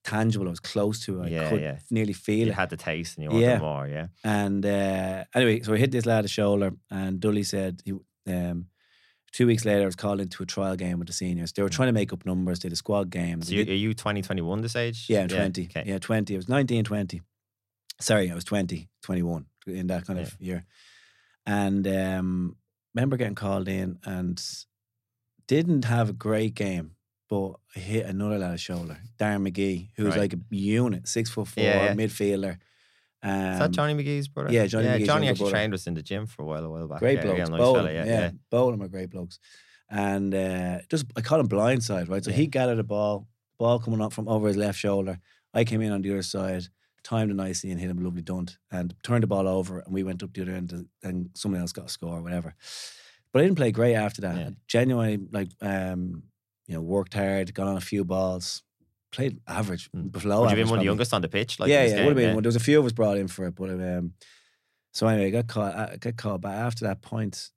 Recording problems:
none

